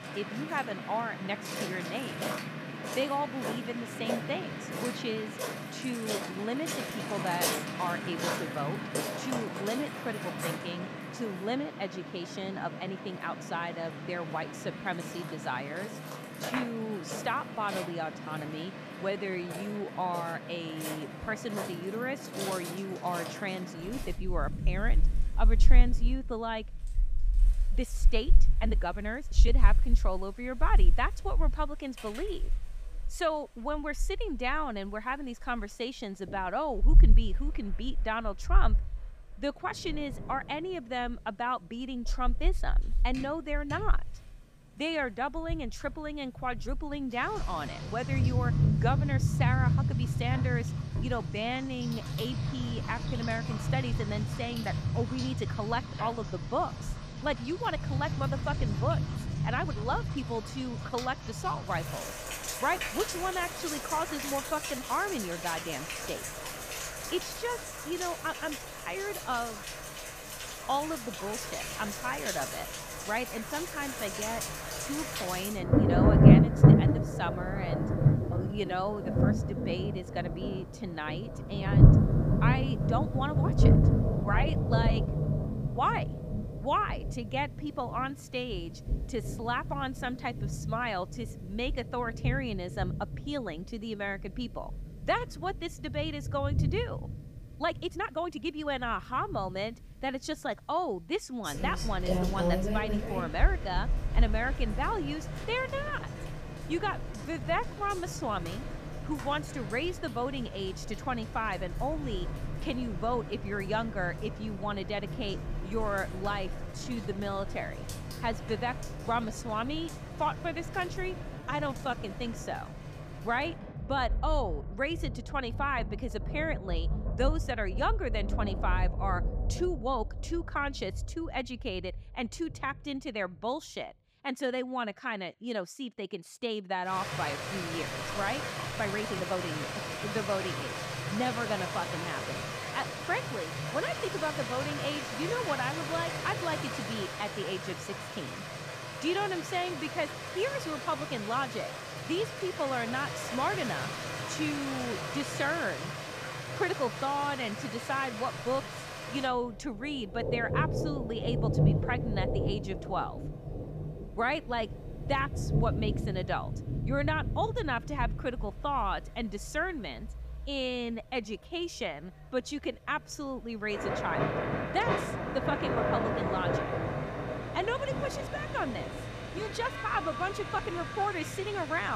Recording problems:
rain or running water; very loud; throughout; 2 dB above the speech
uneven, jittery; strongly; from 19 s to 2:53
abrupt cut into speech; at the end

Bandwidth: 15 kHz